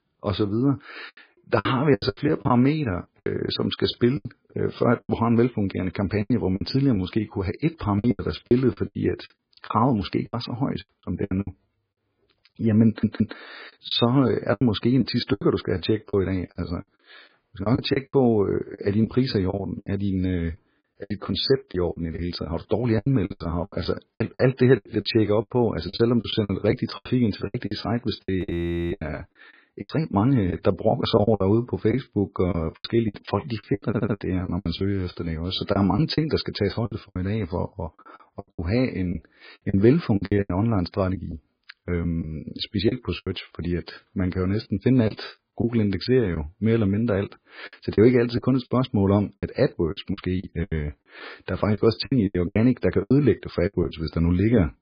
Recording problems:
garbled, watery; badly
choppy; very; 12% of the speech affected
audio stuttering; at 13 s and at 34 s
audio freezing; at 28 s for 0.5 s

